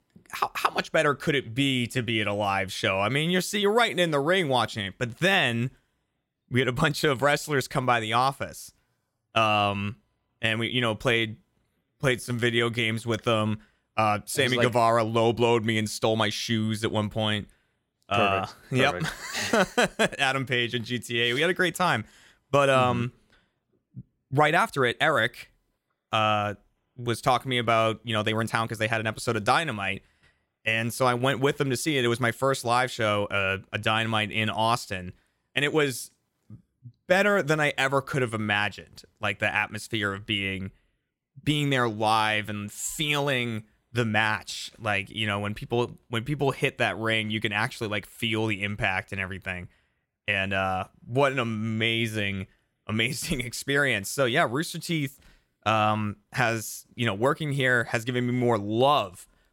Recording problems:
uneven, jittery; strongly; from 6.5 to 40 s

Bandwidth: 16.5 kHz